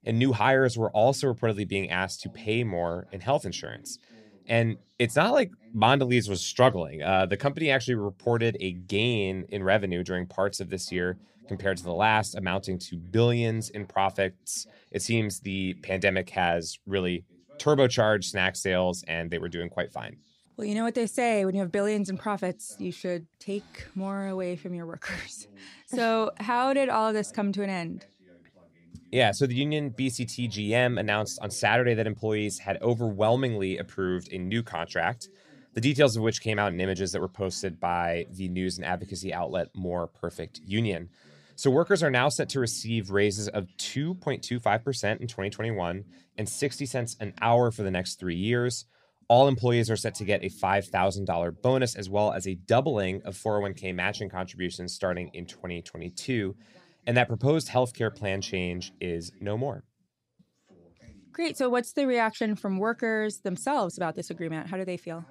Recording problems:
voice in the background; faint; throughout; 30 dB below the speech

